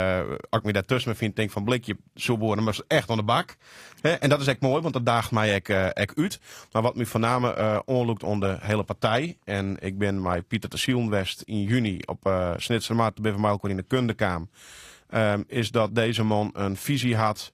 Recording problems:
garbled, watery; slightly; nothing above 15.5 kHz
abrupt cut into speech; at the start

